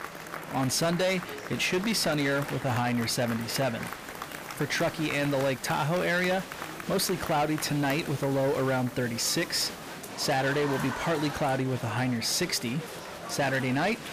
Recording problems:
distortion; slight; 13% of the sound clipped
crowd noise; noticeable; throughout; 10 dB below the speech
murmuring crowd; noticeable; throughout; 20 dB below the speech
hiss; faint; from 4 to 10 s; 20 dB below the speech

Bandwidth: 15 kHz